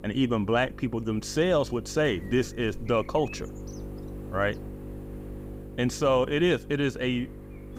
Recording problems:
electrical hum; noticeable; throughout; 50 Hz, 20 dB below the speech

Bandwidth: 15.5 kHz